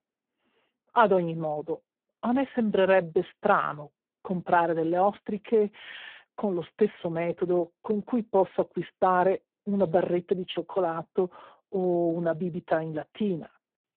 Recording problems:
phone-call audio; poor line

